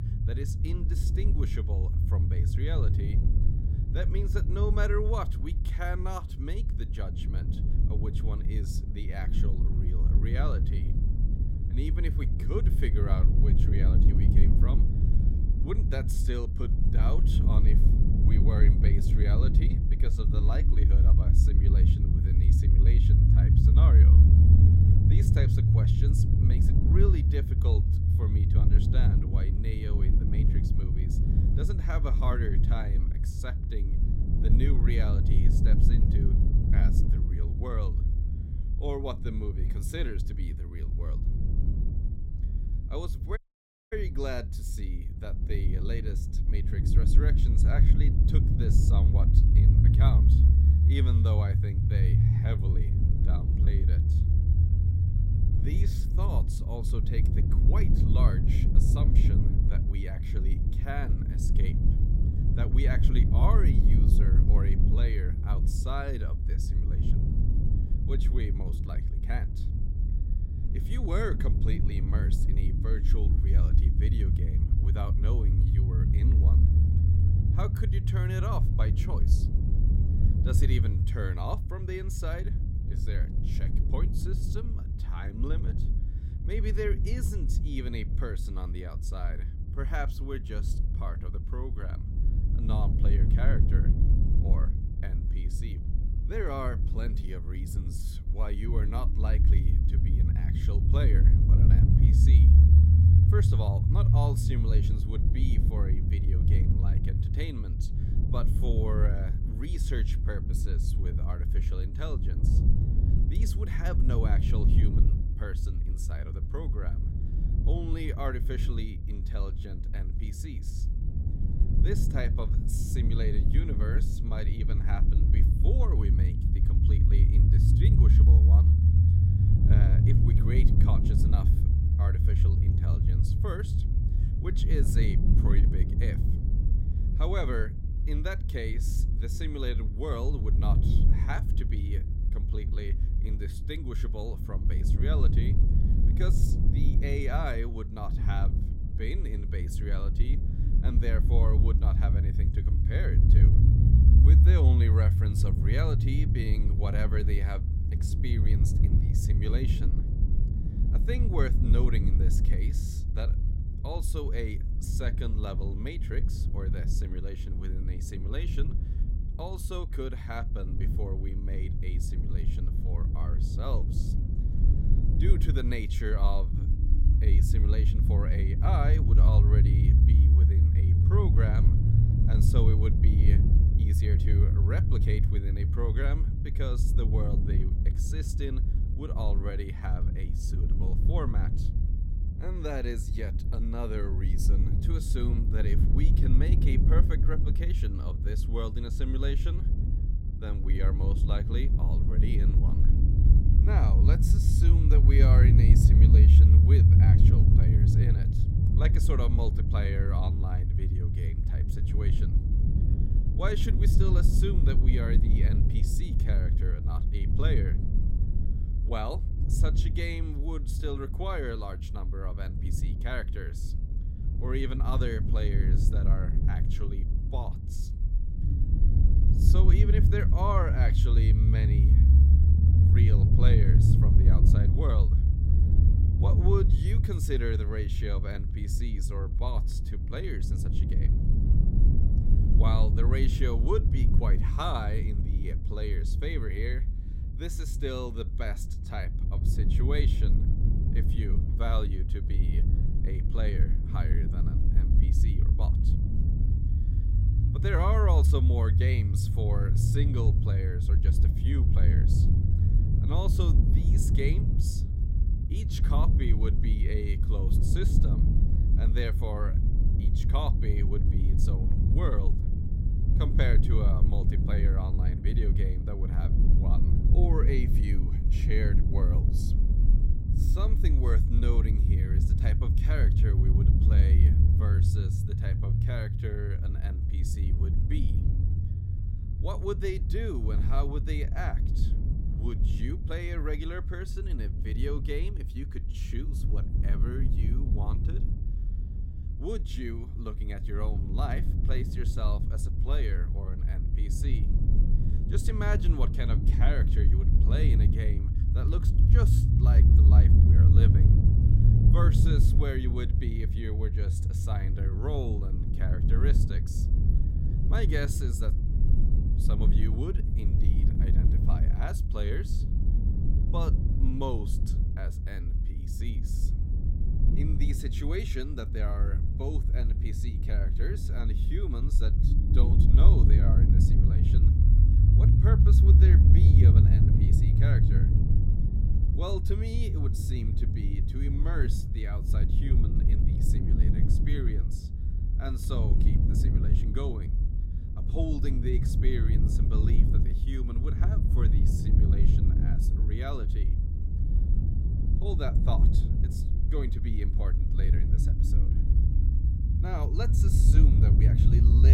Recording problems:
low rumble; loud; throughout; 1 dB below the speech
audio cutting out; at 43 s for 0.5 s
abrupt cut into speech; at the end

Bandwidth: 16 kHz